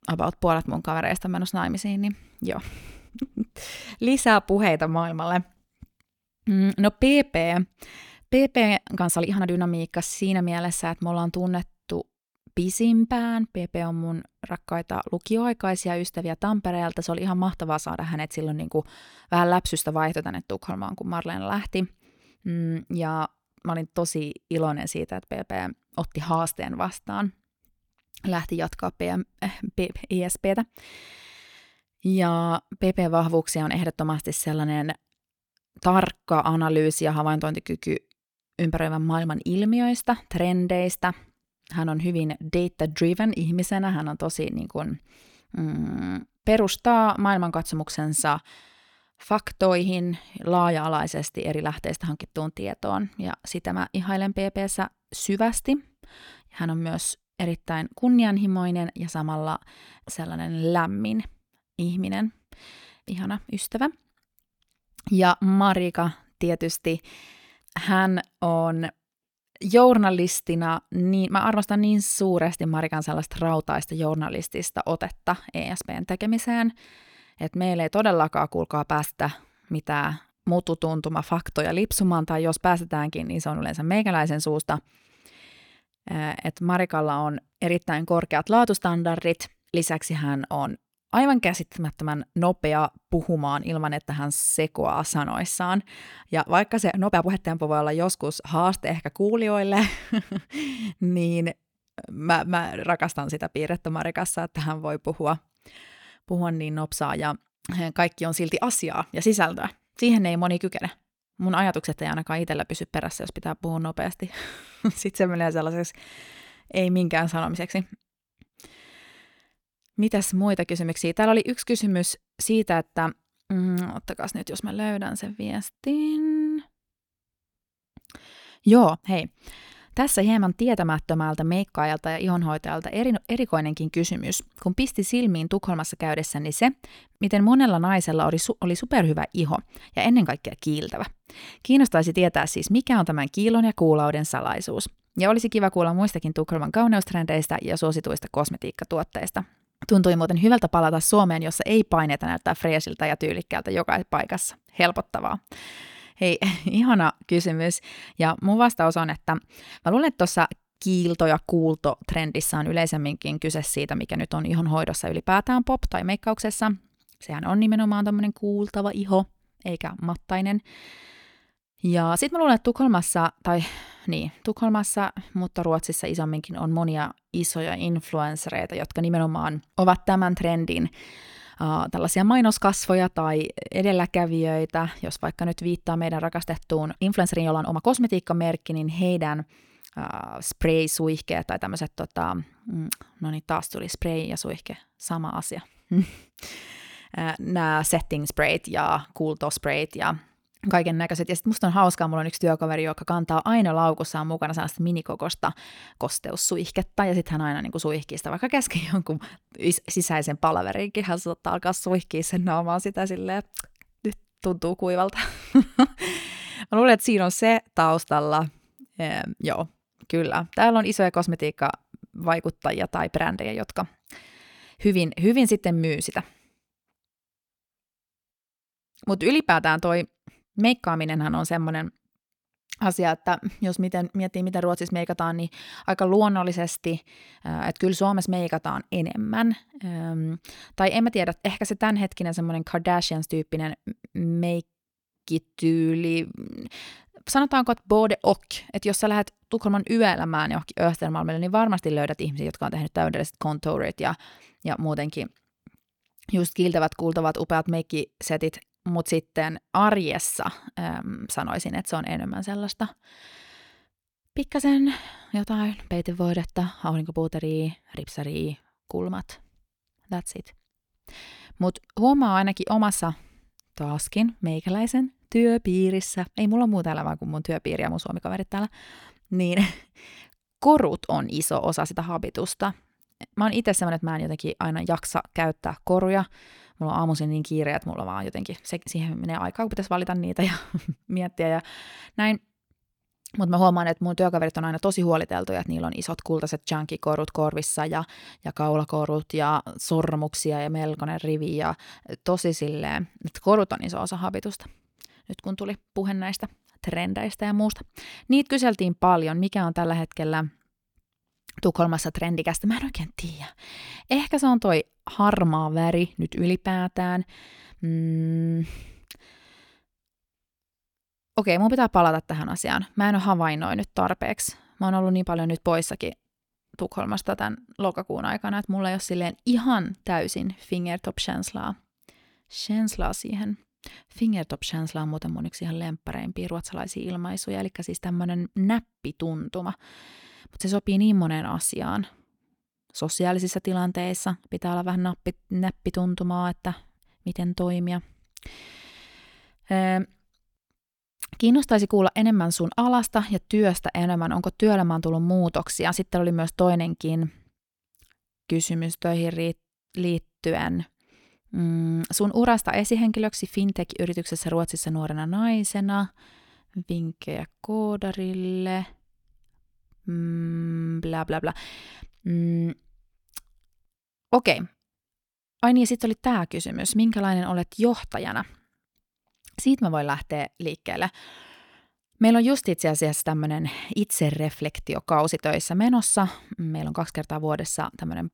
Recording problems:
uneven, jittery; strongly; from 9 s to 3:41

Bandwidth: 18.5 kHz